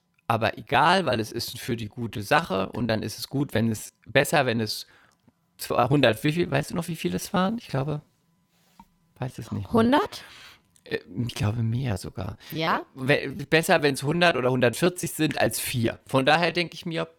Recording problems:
choppy; very; 16% of the speech affected

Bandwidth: 18.5 kHz